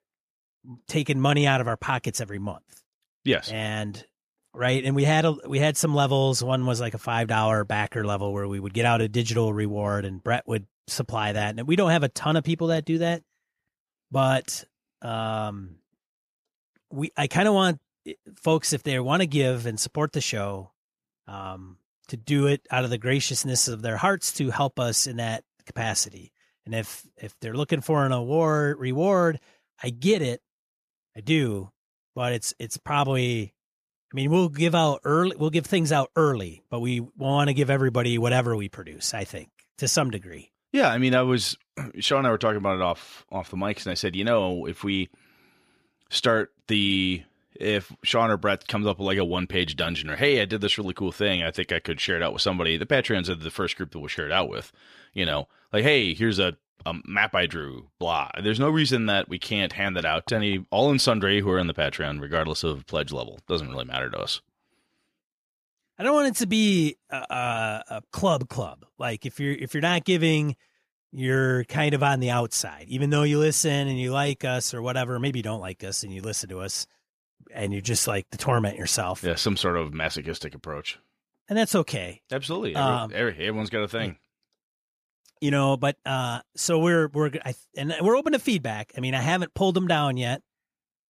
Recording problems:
none

